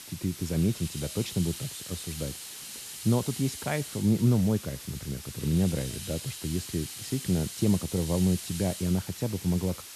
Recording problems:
hiss; loud; throughout; 9 dB below the speech

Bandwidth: 13.5 kHz